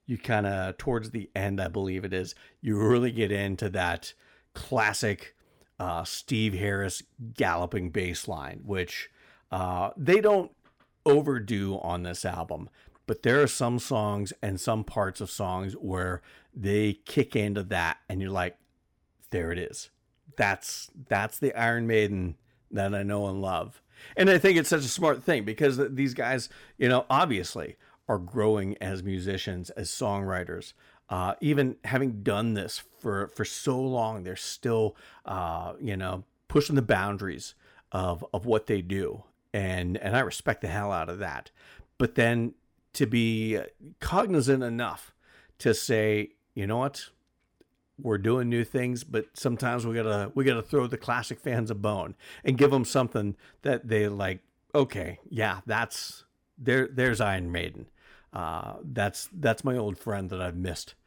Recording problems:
none

